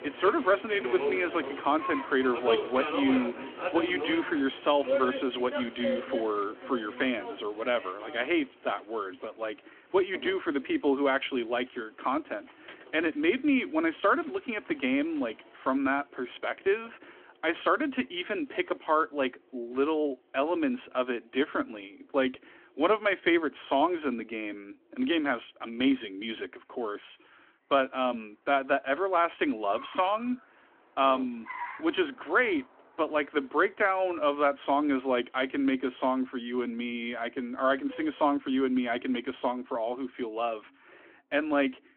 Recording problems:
phone-call audio; nothing above 3.5 kHz
traffic noise; loud; throughout; 7 dB below the speech

